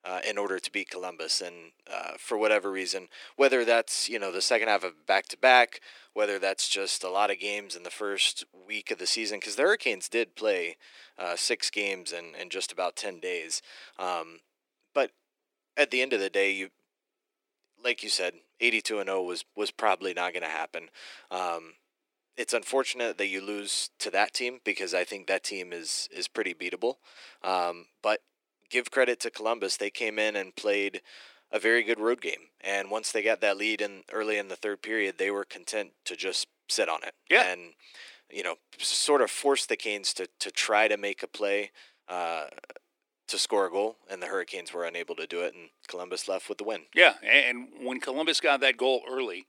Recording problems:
thin; very; fading below 300 Hz

